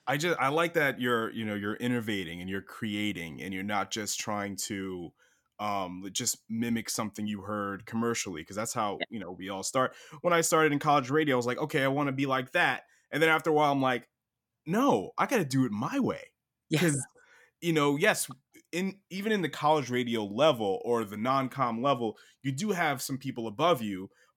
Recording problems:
none

